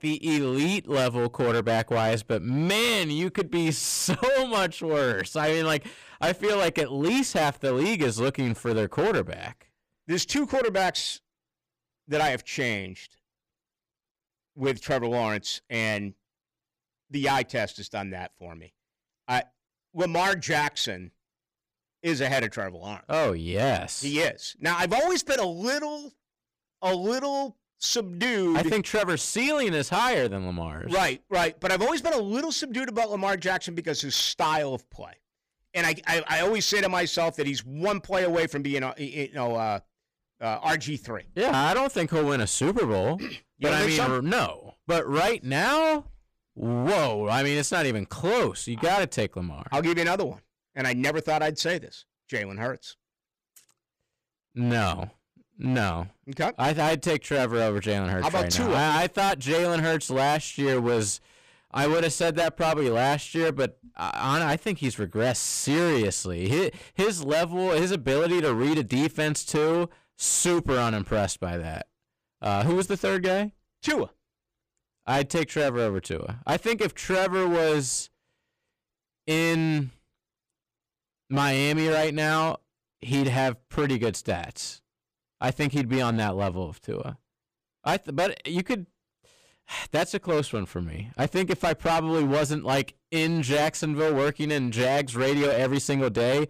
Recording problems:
distortion; heavy; 14% of the sound clipped

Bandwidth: 15 kHz